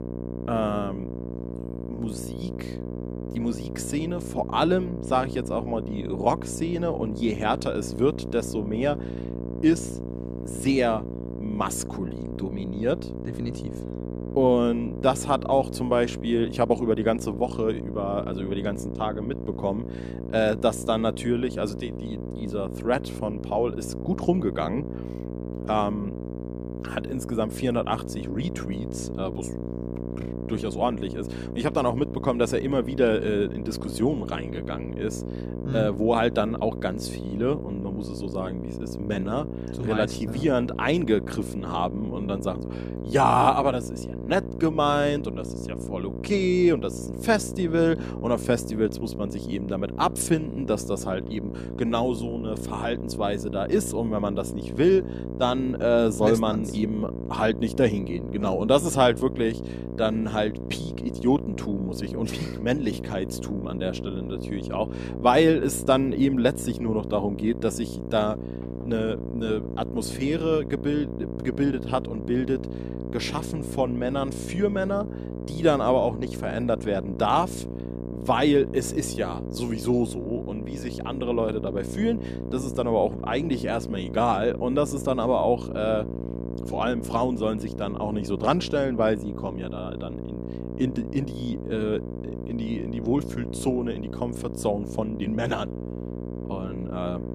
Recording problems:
electrical hum; noticeable; throughout; 60 Hz, 10 dB below the speech

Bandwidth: 14.5 kHz